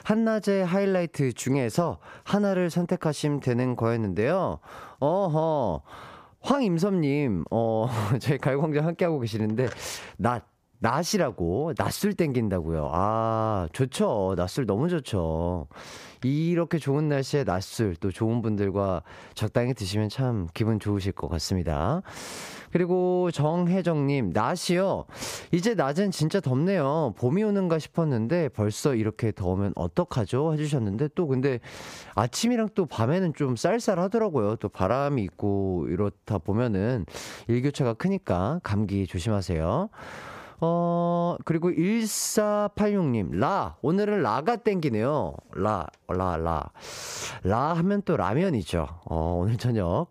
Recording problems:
squashed, flat; somewhat

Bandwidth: 15 kHz